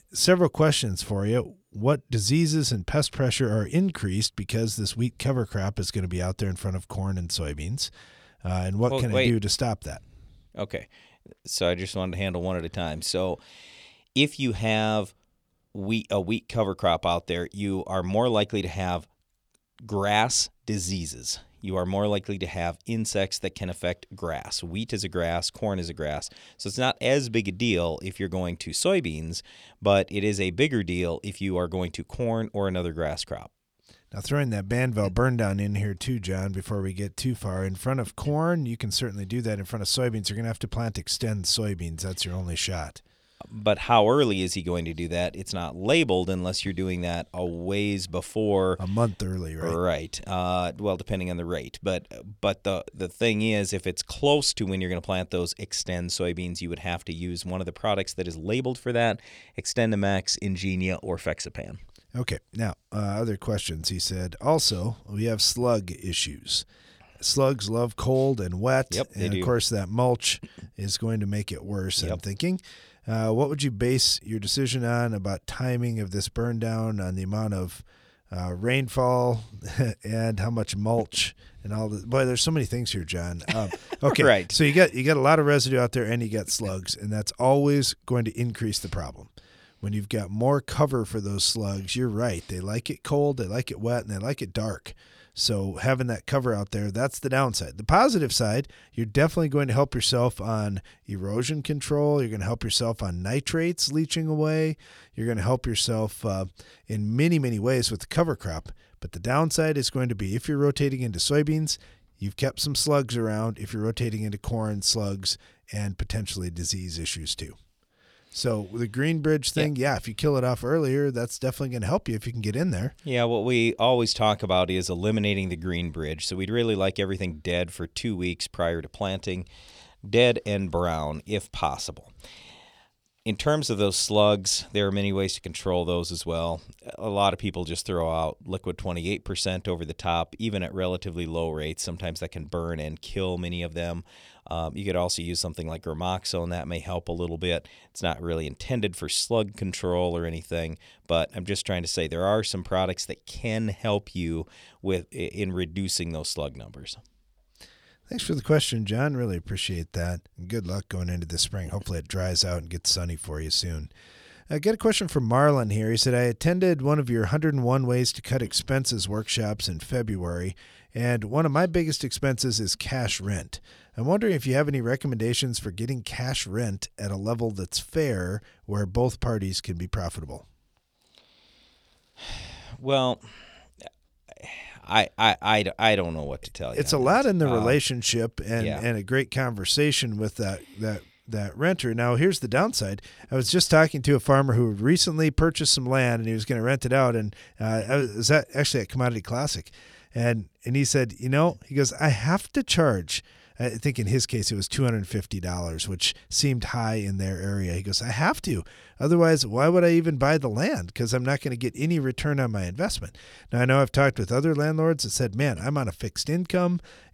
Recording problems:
none

